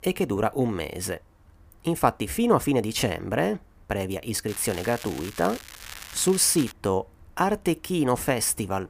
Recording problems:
crackling; noticeable; from 4.5 to 6.5 s; 15 dB below the speech

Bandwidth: 15 kHz